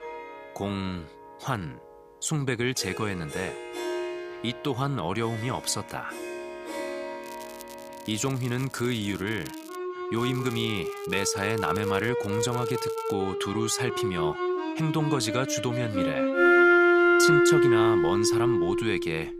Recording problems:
background music; very loud; throughout; 4 dB above the speech
crackling; noticeable; from 7 to 10 s, from 10 to 12 s and at 12 s; 20 dB below the speech

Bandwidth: 15 kHz